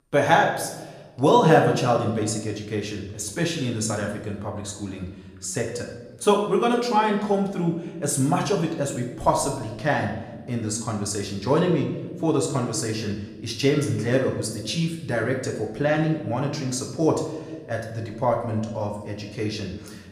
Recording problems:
room echo; slight; dies away in 0.9 s
off-mic speech; somewhat distant

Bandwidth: 14.5 kHz